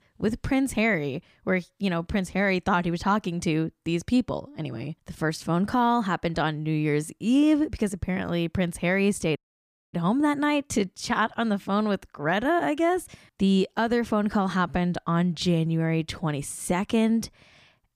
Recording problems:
audio cutting out; at 9.5 s for 0.5 s

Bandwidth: 15 kHz